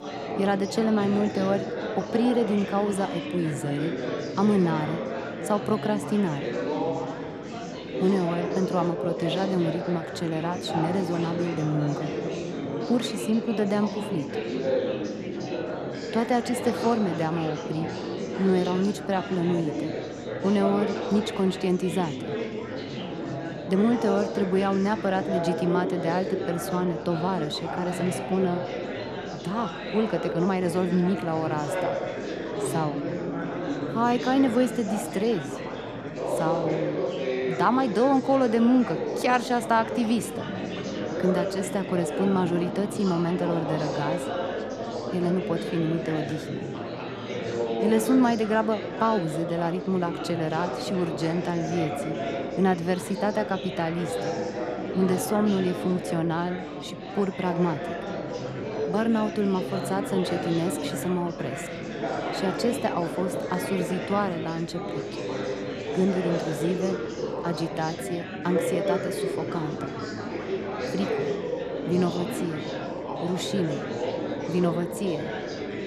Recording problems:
chatter from many people; loud; throughout; 4 dB below the speech

